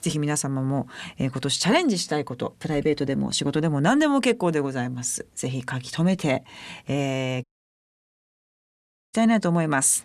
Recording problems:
audio cutting out; at 7.5 s for 1.5 s

